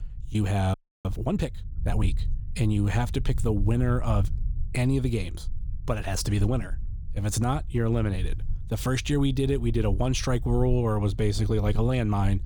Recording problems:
low rumble; faint; throughout; 20 dB below the speech
audio freezing; at 0.5 s

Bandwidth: 18.5 kHz